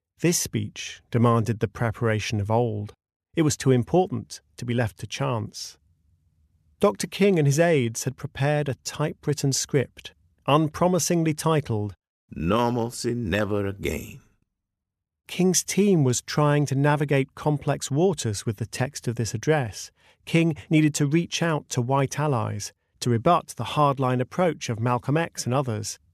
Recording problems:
none

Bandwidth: 14 kHz